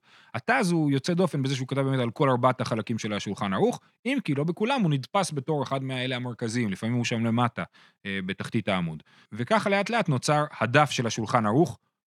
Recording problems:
none

